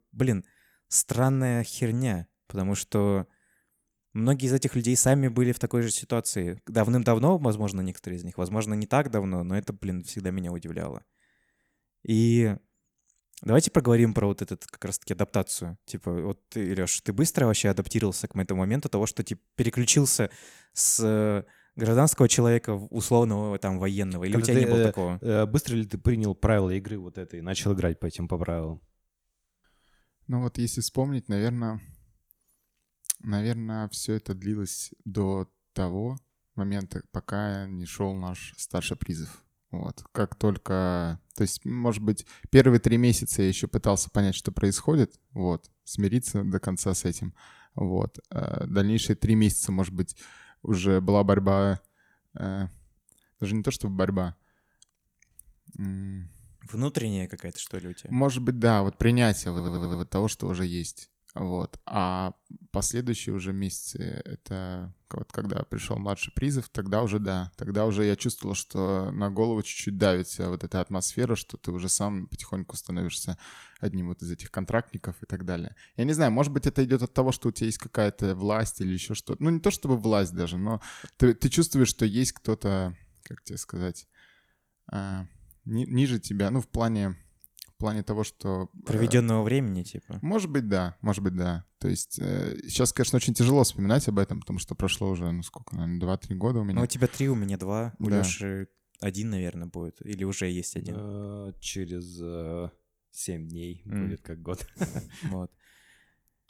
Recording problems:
audio stuttering; at 1:00

